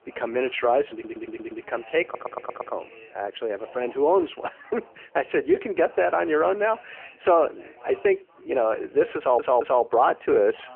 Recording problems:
phone-call audio; poor line
chatter from many people; faint; throughout; 25 dB below the speech
audio stuttering; at 1 s, at 2 s and at 9 s

